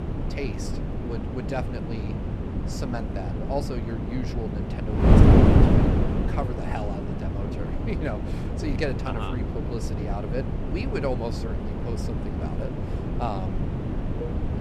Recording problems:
wind noise on the microphone; heavy; 2 dB above the speech
clattering dishes; noticeable; at 14 s; peak 5 dB below the speech

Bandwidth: 14 kHz